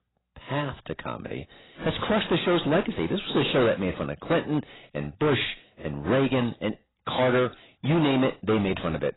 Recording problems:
distortion; heavy; 11% of the sound clipped
garbled, watery; badly; nothing above 4 kHz

